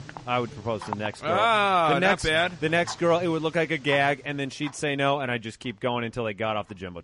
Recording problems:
garbled, watery; slightly; nothing above 10.5 kHz
household noises; noticeable; throughout; 15 dB below the speech

